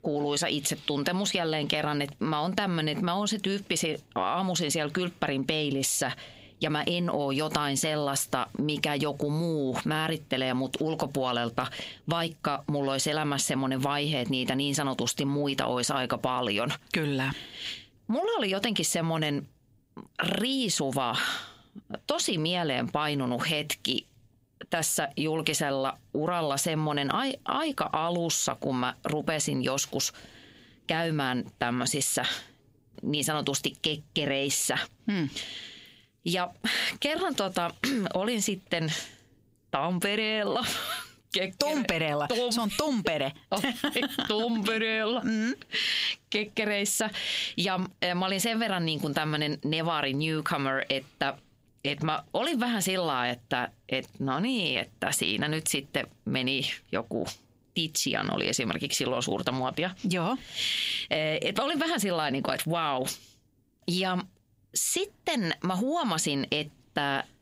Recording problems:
squashed, flat; heavily

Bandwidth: 15.5 kHz